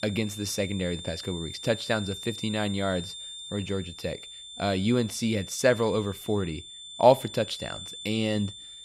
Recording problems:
high-pitched whine; noticeable; throughout; 3.5 kHz, 10 dB below the speech

